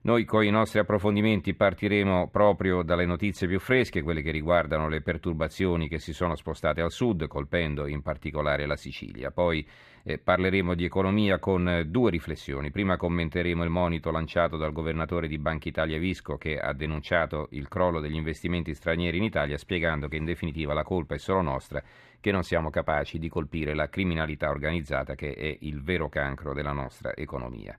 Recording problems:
muffled; slightly; fading above 3.5 kHz

